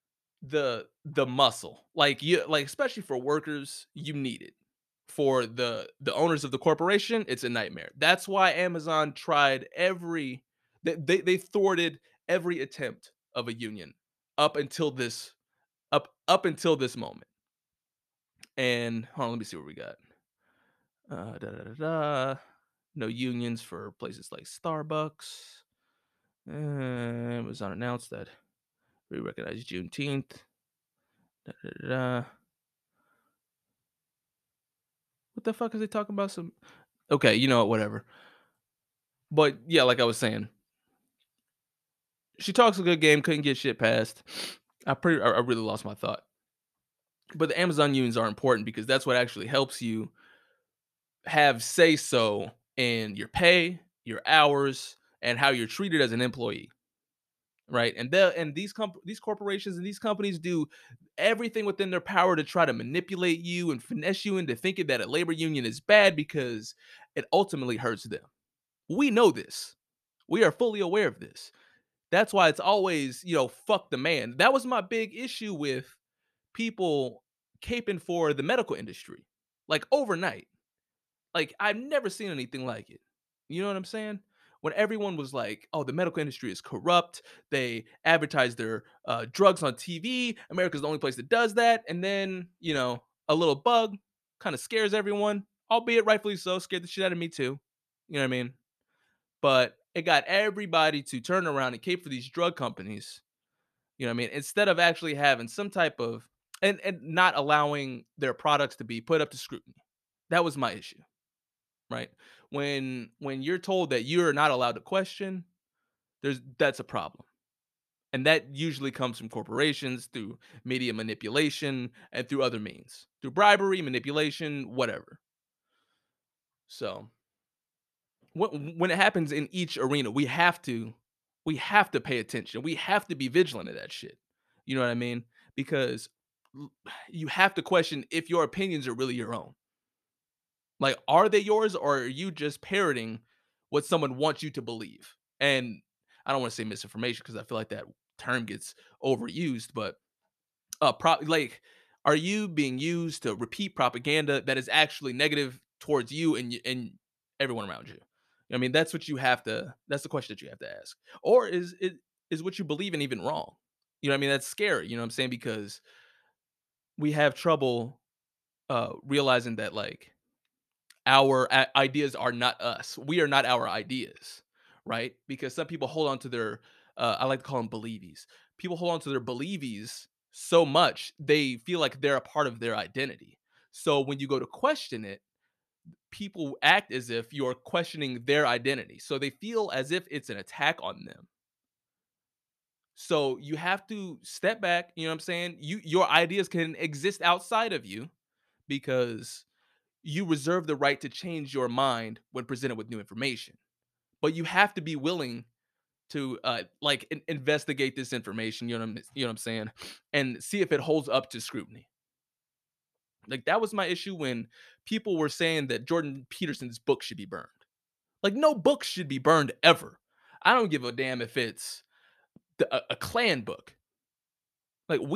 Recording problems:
abrupt cut into speech; at the end

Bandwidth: 14 kHz